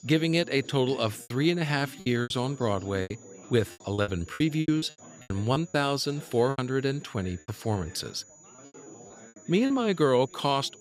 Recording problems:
high-pitched whine; faint; throughout; 7 kHz, 25 dB below the speech
background chatter; faint; throughout; 4 voices, 20 dB below the speech
choppy; very; 10% of the speech affected

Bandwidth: 15.5 kHz